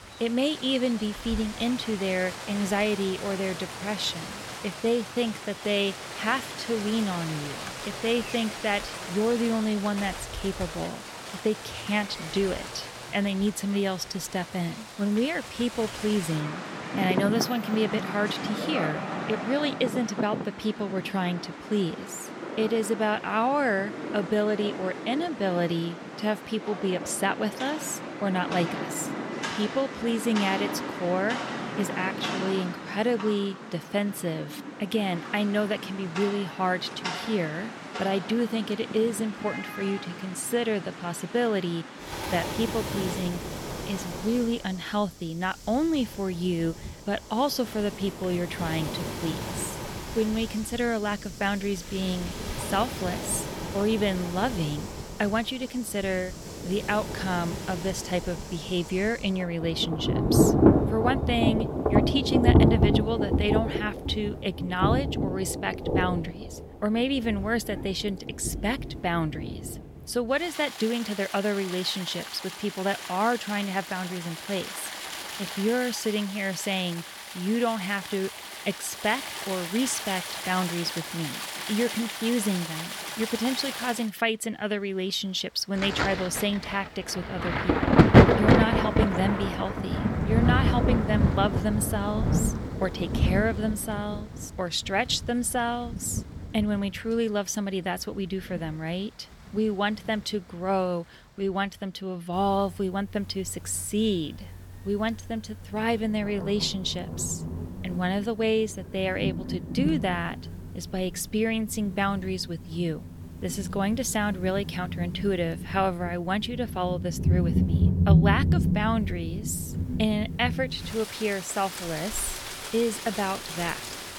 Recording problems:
rain or running water; loud; throughout; 2 dB below the speech

